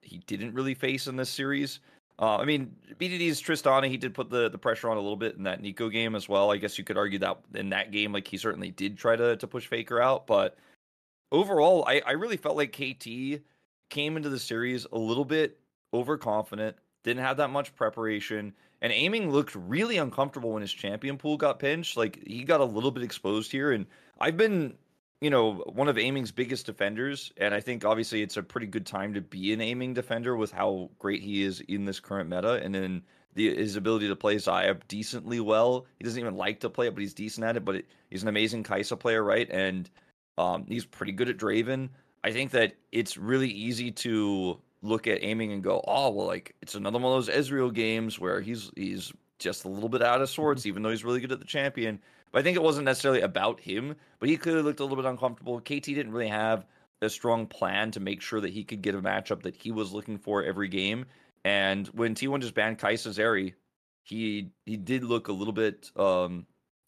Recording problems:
none

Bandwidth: 13.5 kHz